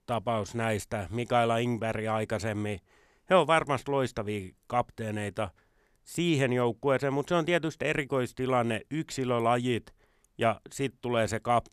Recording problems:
none

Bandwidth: 13.5 kHz